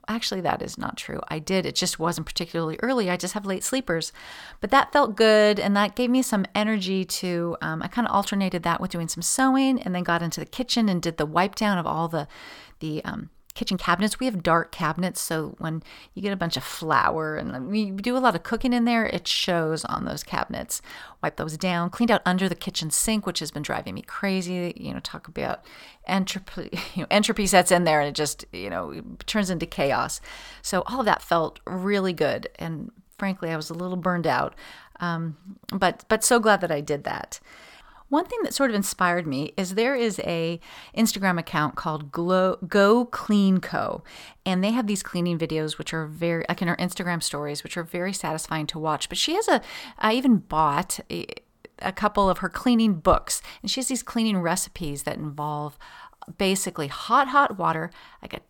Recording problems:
uneven, jittery; strongly; from 13 to 58 s

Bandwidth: 18 kHz